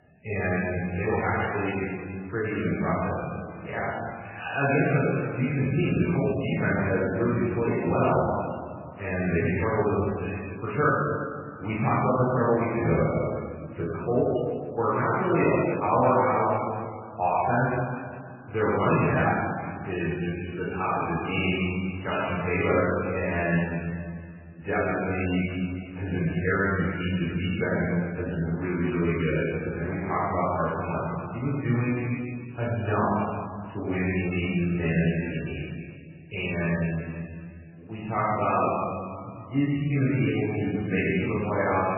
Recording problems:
room echo; strong; dies away in 1.9 s
off-mic speech; far
garbled, watery; badly; nothing above 3 kHz

